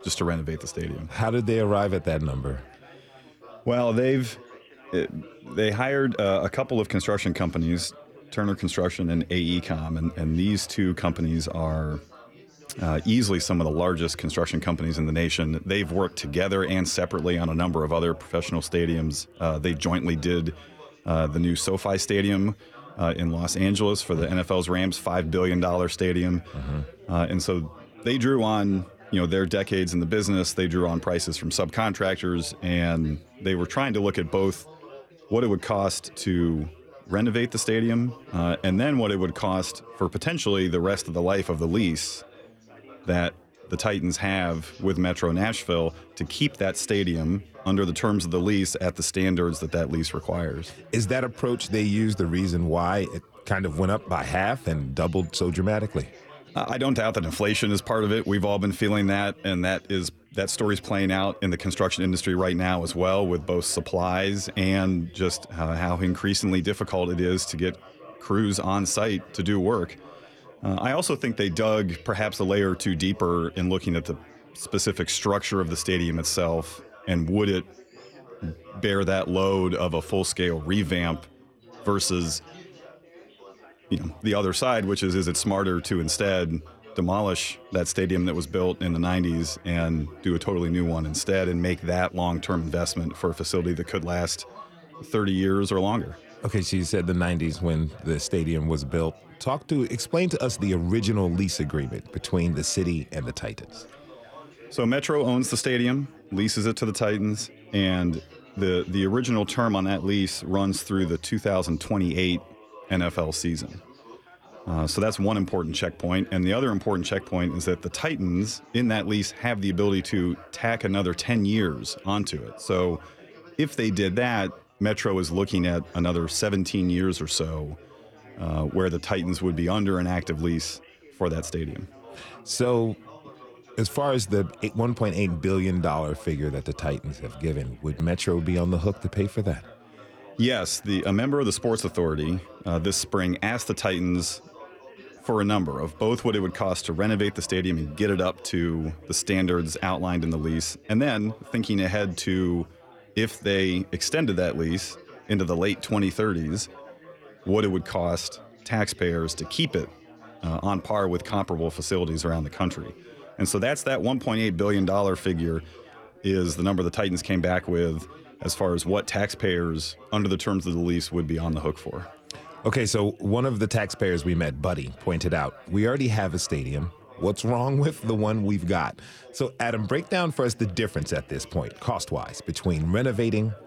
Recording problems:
chatter from many people; faint; throughout; 20 dB below the speech

